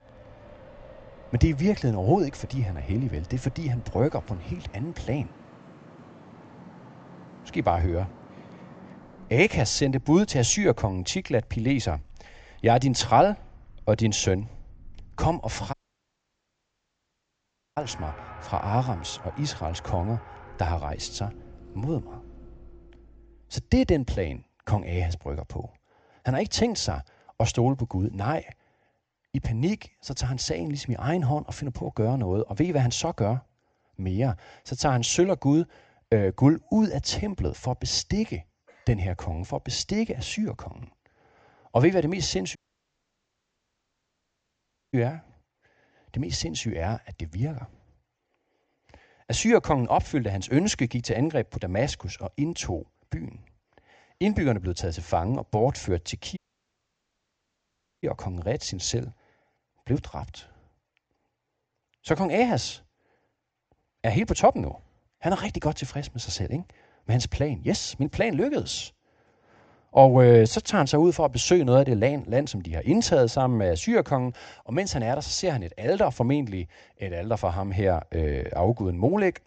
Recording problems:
high frequencies cut off; noticeable; nothing above 8 kHz
traffic noise; faint; until 23 s; 20 dB below the speech
audio cutting out; at 16 s for 2 s, at 43 s for 2.5 s and at 56 s for 1.5 s

